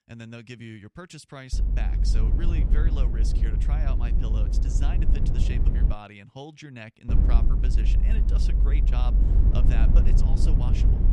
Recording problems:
low rumble; loud; from 1.5 to 6 s and from 7 s on; as loud as the speech

